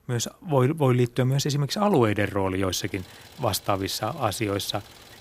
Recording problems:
traffic noise; faint; throughout; 25 dB below the speech

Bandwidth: 15.5 kHz